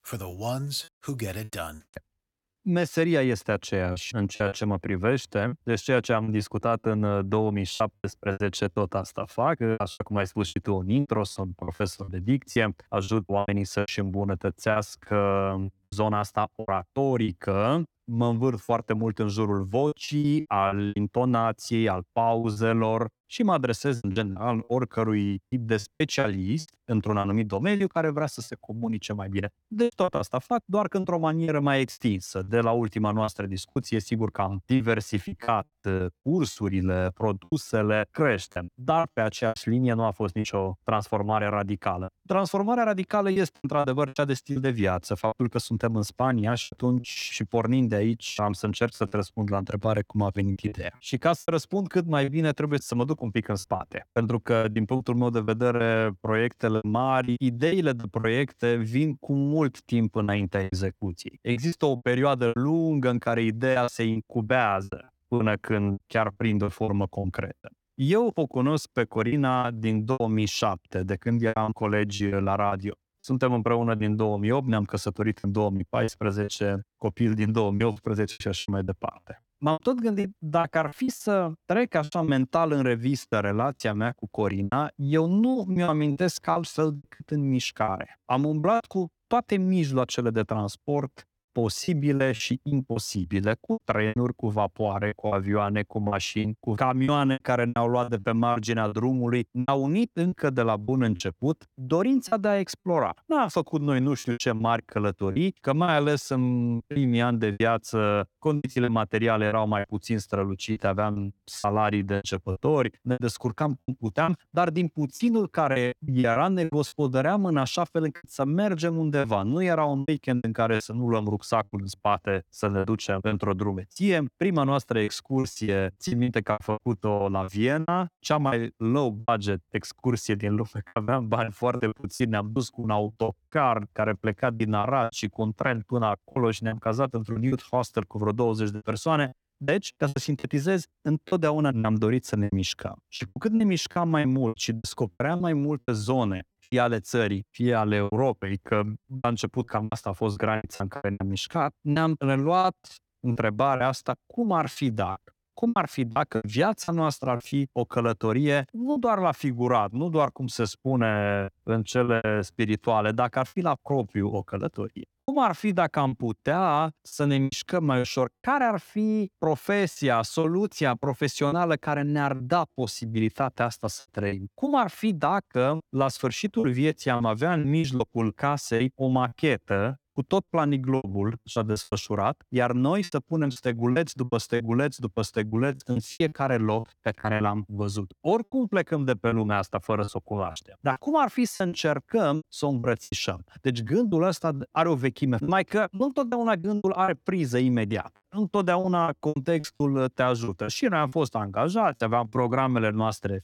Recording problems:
choppy; very; 10% of the speech affected

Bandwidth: 18 kHz